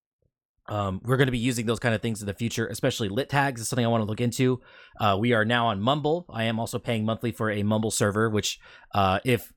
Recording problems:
none

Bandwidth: 18 kHz